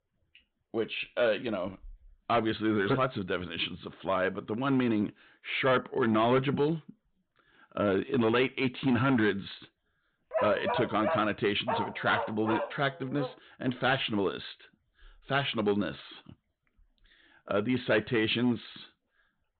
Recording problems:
high frequencies cut off; severe; nothing above 4 kHz
distortion; slight; 4% of the sound clipped
dog barking; noticeable; from 10 to 13 s; peak 1 dB below the speech

